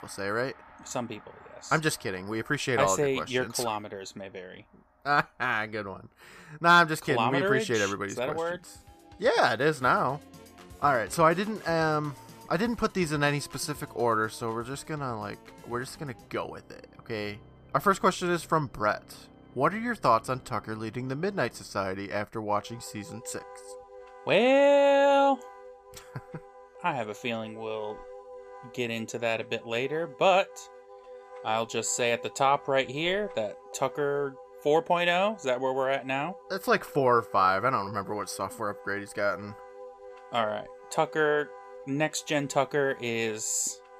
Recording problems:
background music; faint; throughout; 20 dB below the speech

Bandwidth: 14.5 kHz